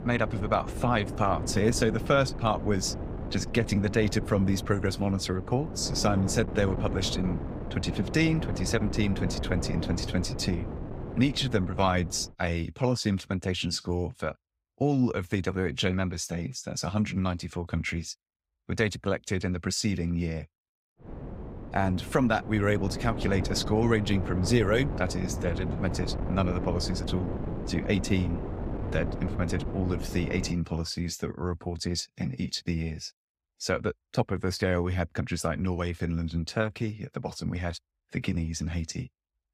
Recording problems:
wind noise on the microphone; heavy; until 12 s and from 21 to 31 s; 9 dB below the speech

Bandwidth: 15.5 kHz